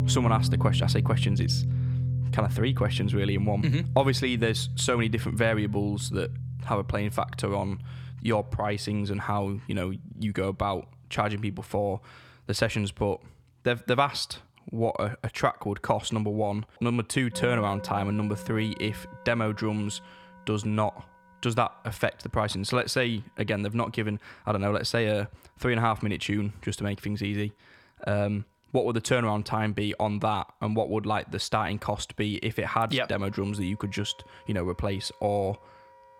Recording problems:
background music; loud; throughout; 3 dB below the speech

